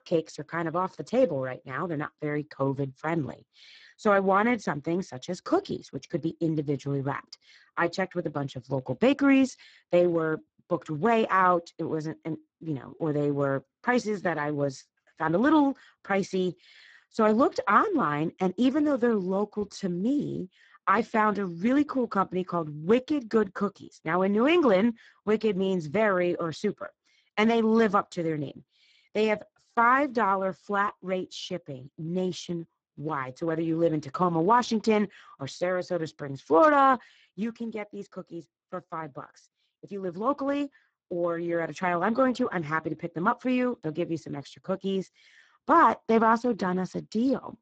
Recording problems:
garbled, watery; badly; nothing above 7.5 kHz

